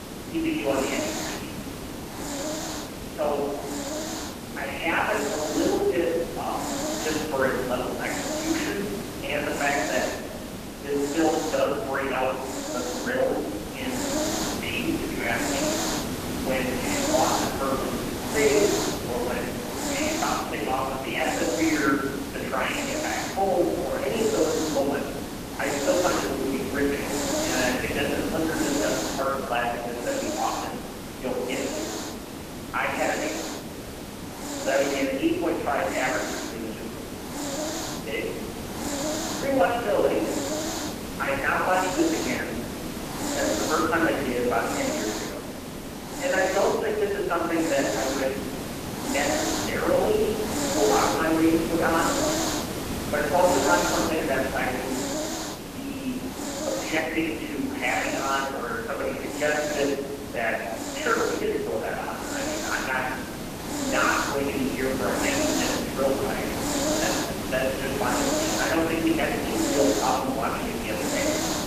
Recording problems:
phone-call audio; poor line; nothing above 3 kHz
off-mic speech; far
room echo; noticeable; dies away in 1 s
hiss; loud; throughout; 3 dB below the speech

